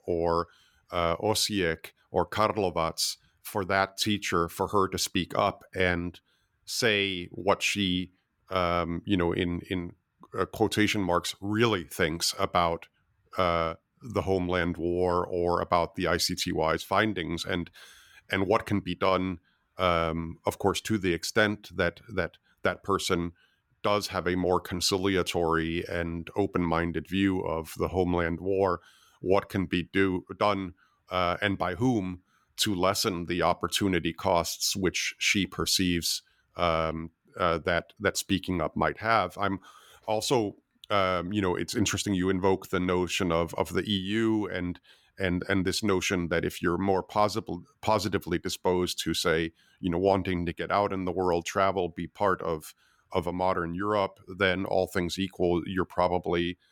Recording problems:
none

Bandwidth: 17.5 kHz